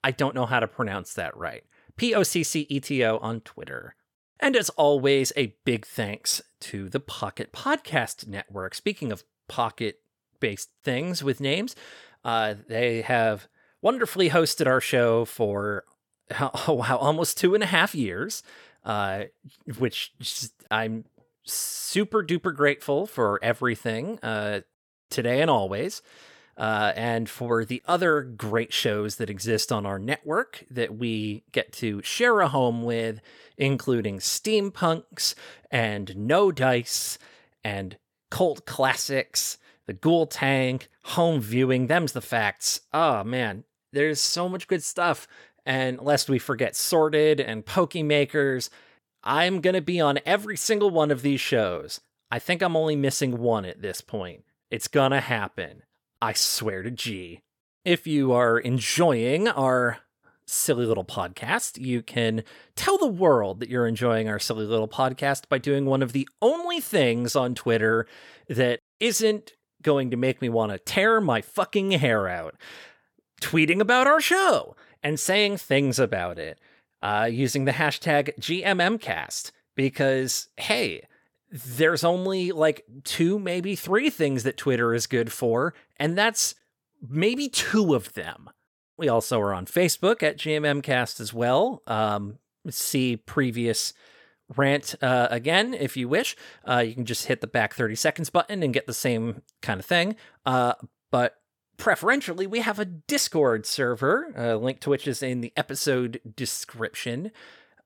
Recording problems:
none

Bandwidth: 18 kHz